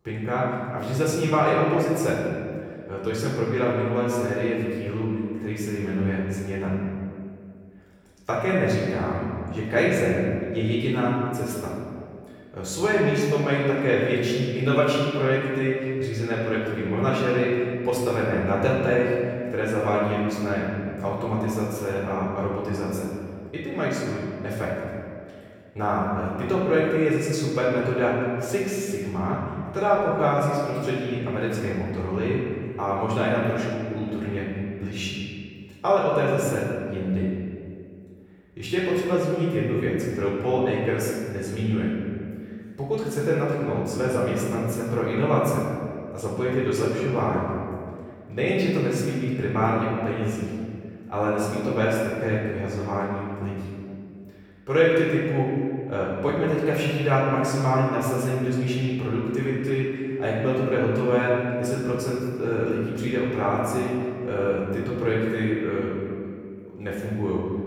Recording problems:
off-mic speech; far
room echo; noticeable; dies away in 1.9 s

